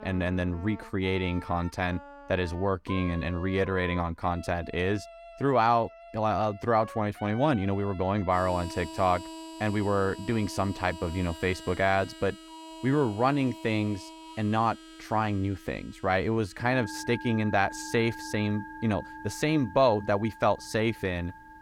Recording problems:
background music; noticeable; throughout; 15 dB below the speech

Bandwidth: 17.5 kHz